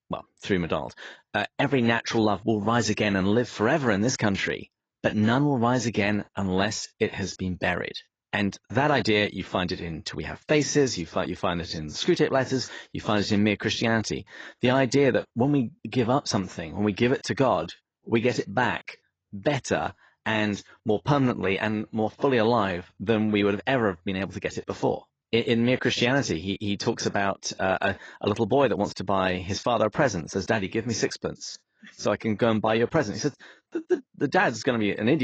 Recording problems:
garbled, watery; badly
abrupt cut into speech; at the end

